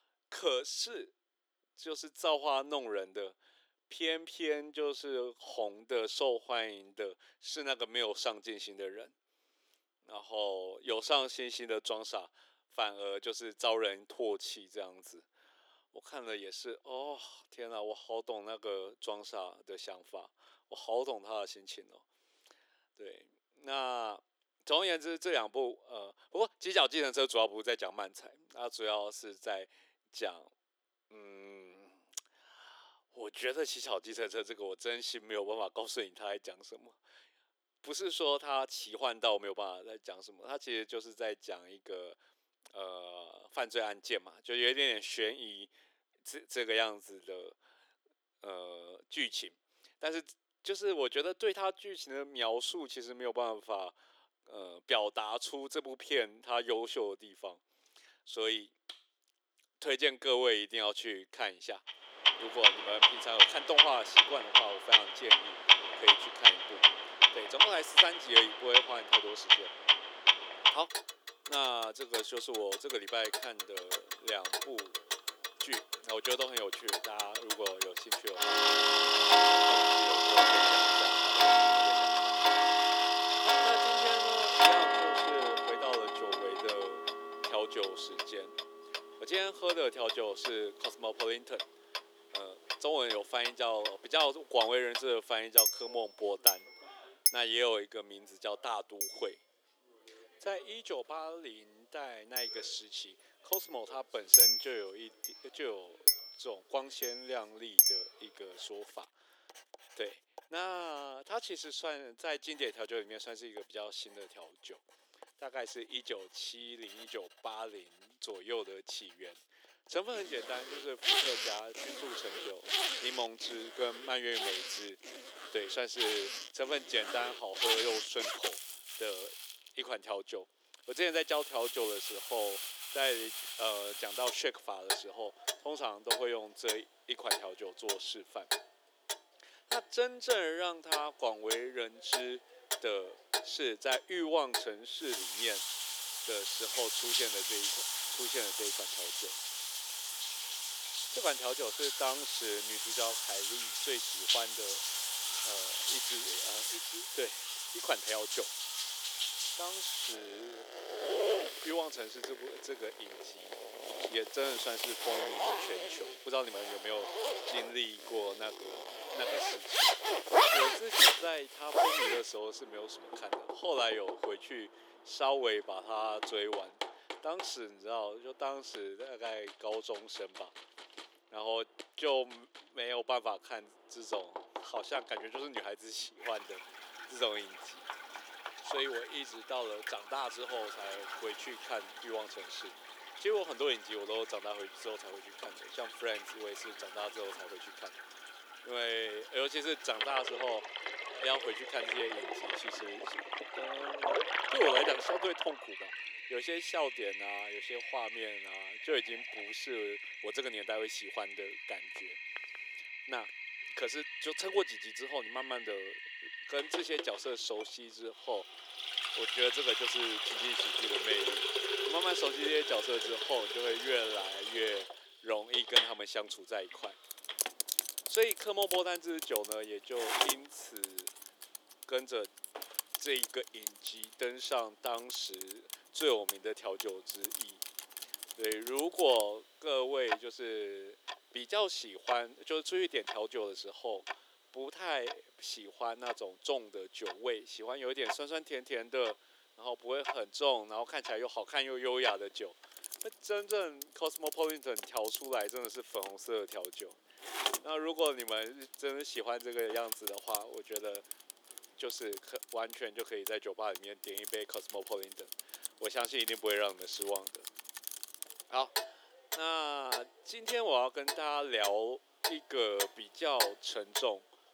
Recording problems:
thin; very; fading below 350 Hz
household noises; very loud; from 1:02 on; 6 dB above the speech

